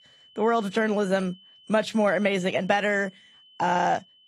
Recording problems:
garbled, watery; slightly; nothing above 15 kHz
high-pitched whine; faint; throughout; 3 kHz, 25 dB below the speech

